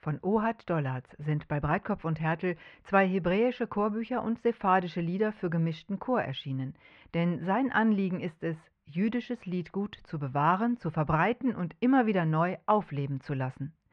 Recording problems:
muffled; very; fading above 2 kHz

